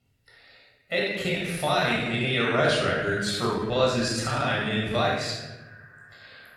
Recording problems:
room echo; strong; dies away in 1.2 s
off-mic speech; far
echo of what is said; faint; throughout; 330 ms later, 25 dB below the speech
uneven, jittery; strongly; from 1 to 5 s

